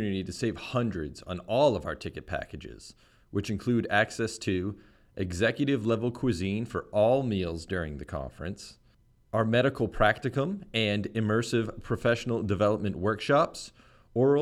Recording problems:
abrupt cut into speech; at the start and the end

